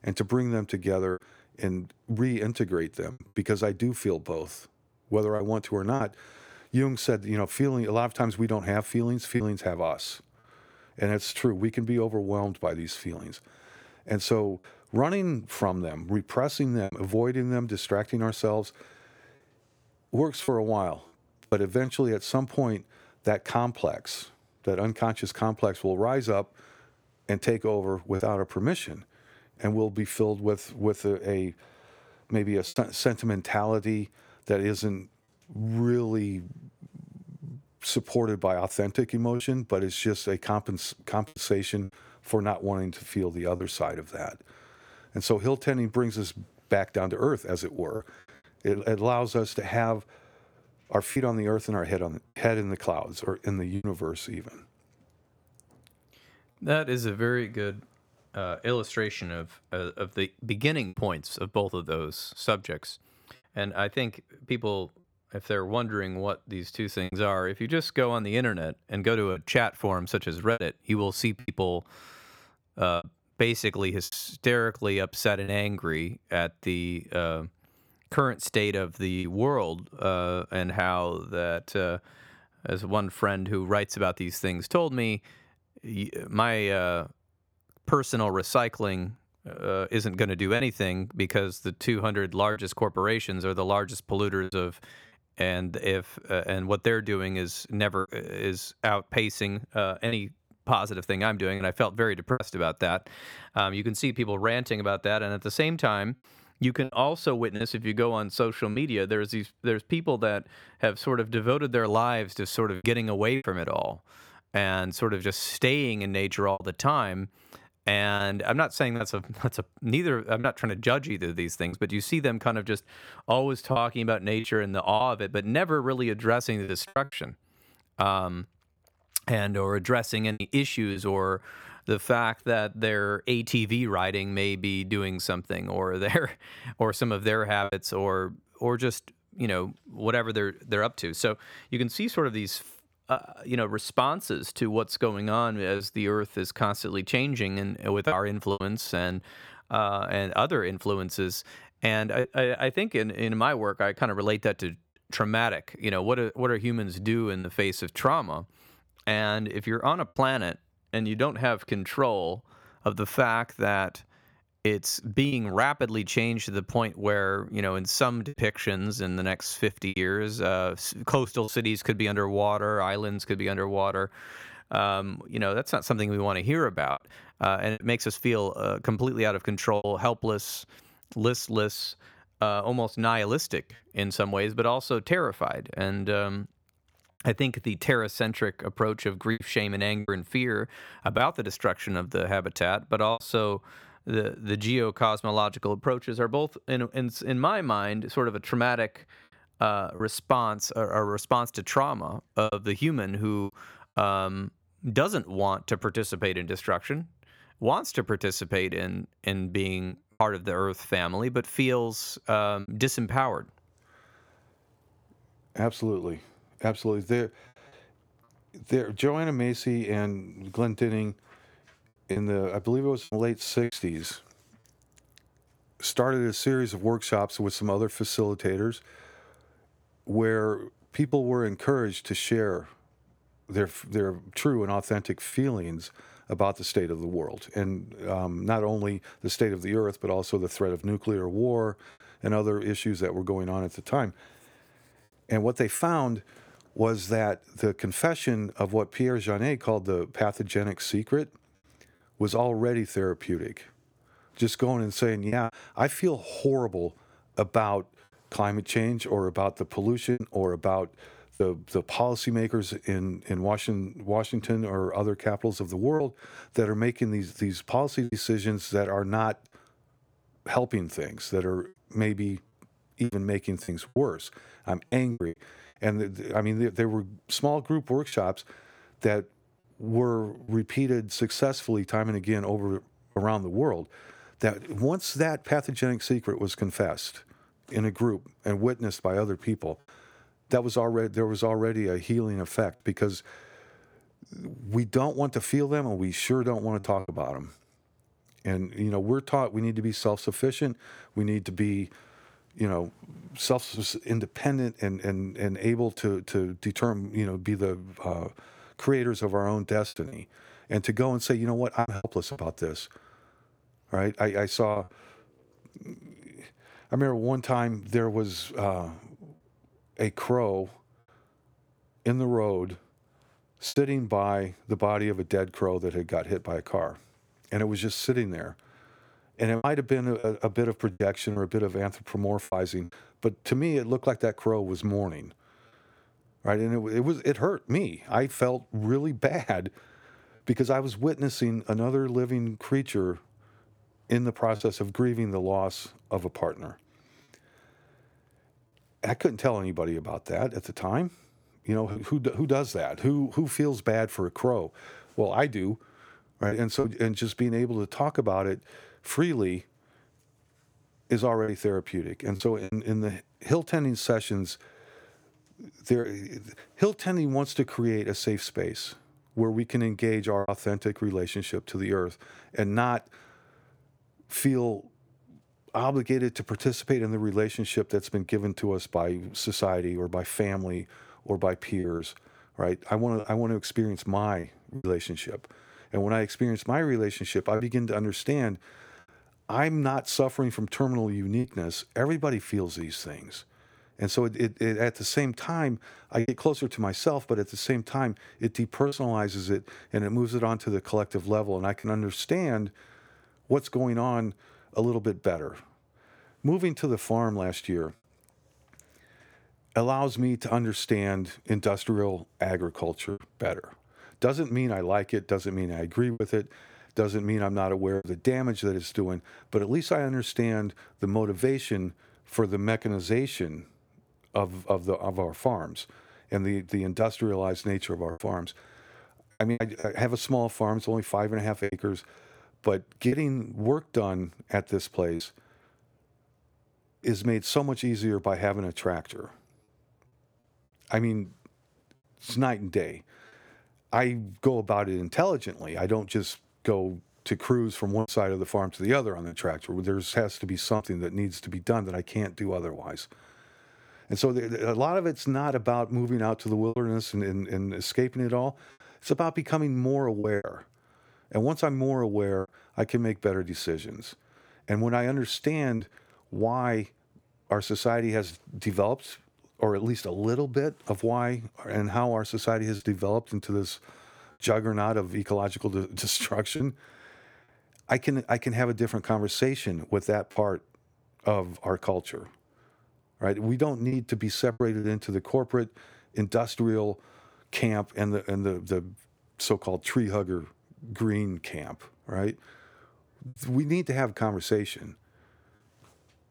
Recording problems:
choppy; occasionally; 2% of the speech affected

